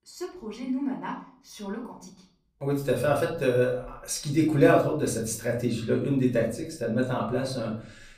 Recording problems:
off-mic speech; far
room echo; slight; dies away in 0.5 s

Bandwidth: 15 kHz